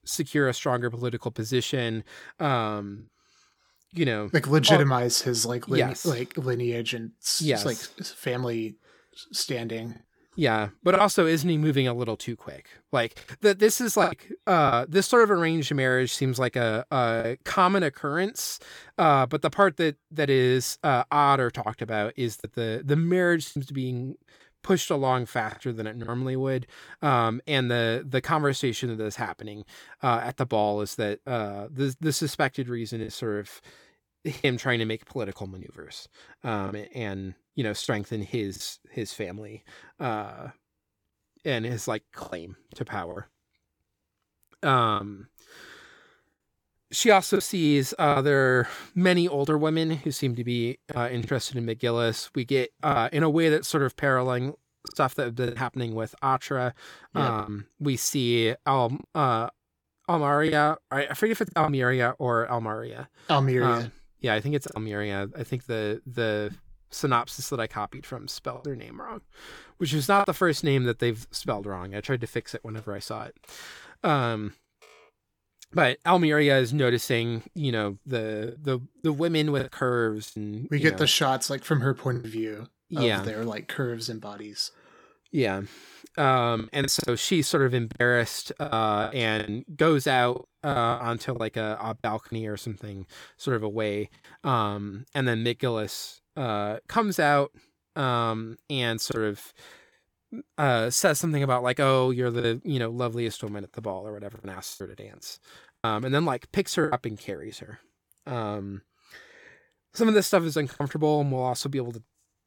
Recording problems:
choppy; occasionally; 4% of the speech affected

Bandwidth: 18.5 kHz